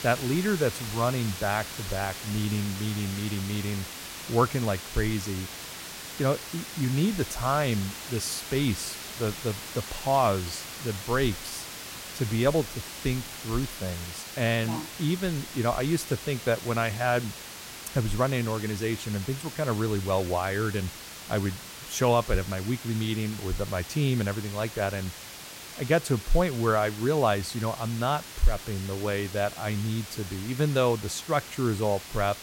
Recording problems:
hiss; loud; throughout; 9 dB below the speech

